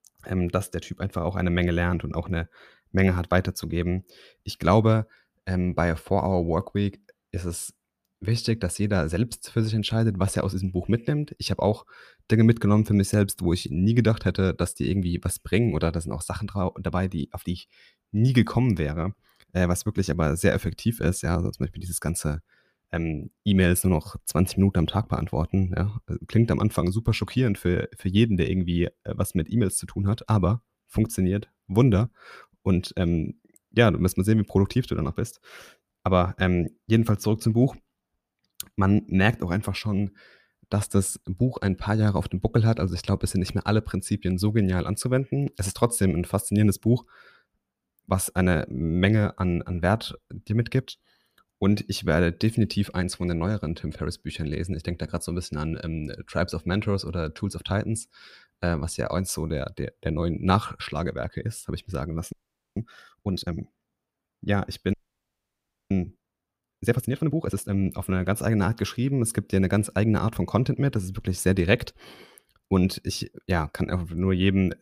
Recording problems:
audio freezing; at 1:02 and at 1:05 for 1 s

